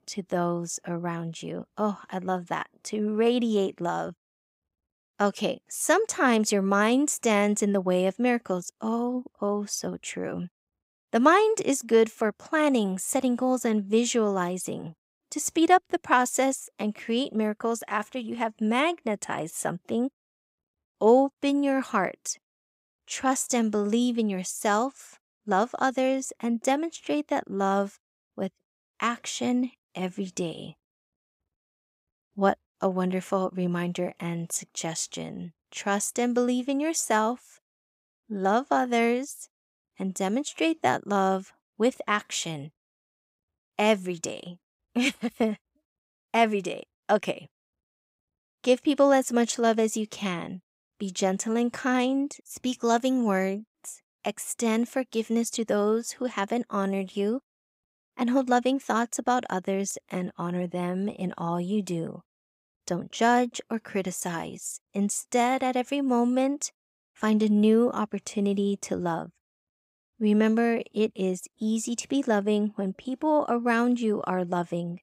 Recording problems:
none

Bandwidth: 15.5 kHz